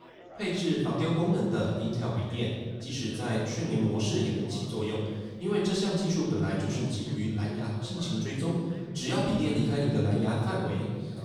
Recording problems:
room echo; strong; dies away in 1.7 s
off-mic speech; far
chatter from many people; faint; throughout; 20 dB below the speech

